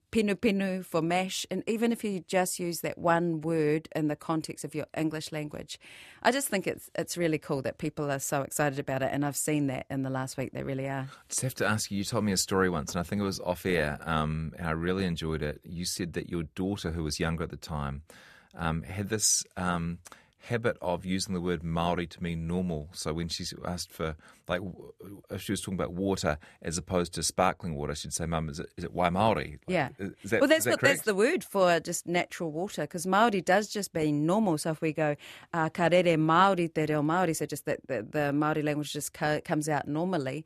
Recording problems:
none

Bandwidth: 14 kHz